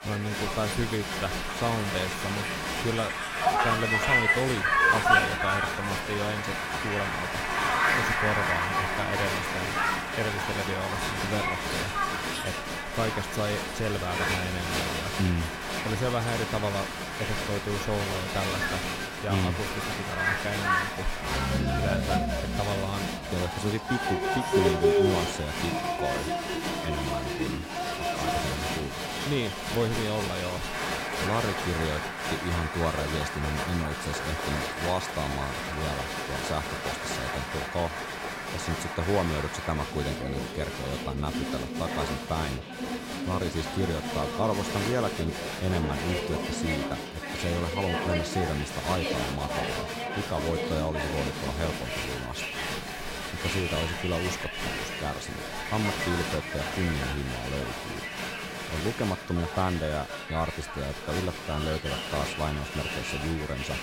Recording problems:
crowd noise; very loud; throughout; 3 dB above the speech

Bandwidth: 16 kHz